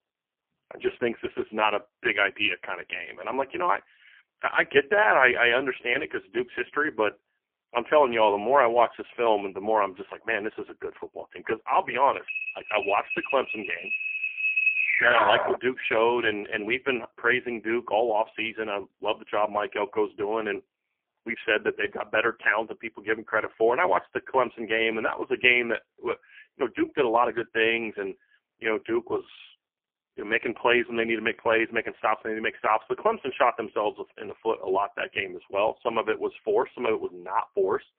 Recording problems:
phone-call audio; poor line; nothing above 3 kHz
alarm; loud; from 12 to 16 s; peak 5 dB above the speech

